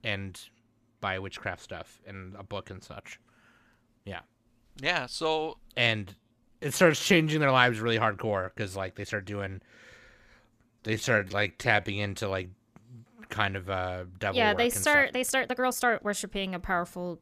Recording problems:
uneven, jittery; strongly; from 6 to 16 s

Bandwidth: 14.5 kHz